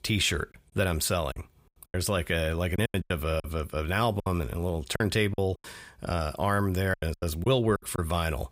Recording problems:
choppy; very; 10% of the speech affected

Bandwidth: 15.5 kHz